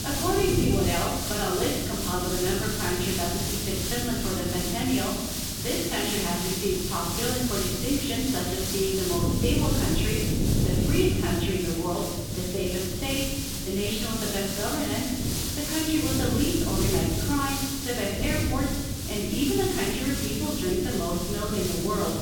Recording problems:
off-mic speech; far
room echo; noticeable; dies away in 1 s
muffled; slightly; fading above 3.5 kHz
wind noise on the microphone; heavy; 10 dB below the speech
hiss; loud; throughout; 2 dB below the speech

